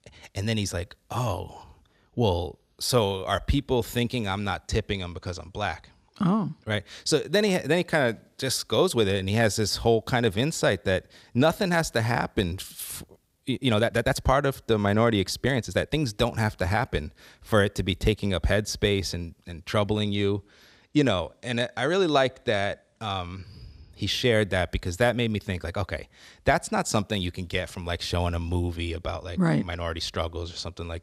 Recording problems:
uneven, jittery; strongly; from 3 to 26 s

